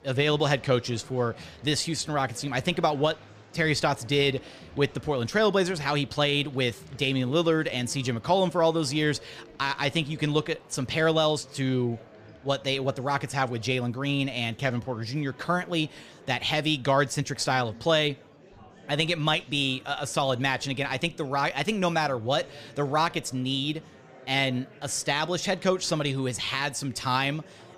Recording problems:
murmuring crowd; faint; throughout; 25 dB below the speech

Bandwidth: 15 kHz